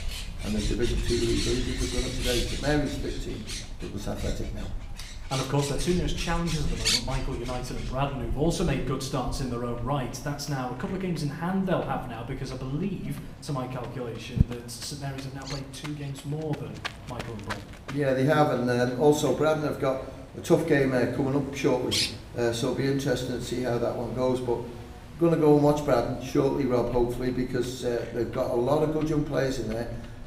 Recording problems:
room echo; slight; dies away in 0.7 s
off-mic speech; somewhat distant
animal sounds; loud; throughout; 8 dB below the speech

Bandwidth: 15.5 kHz